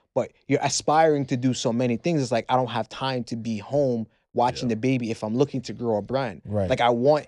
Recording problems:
none

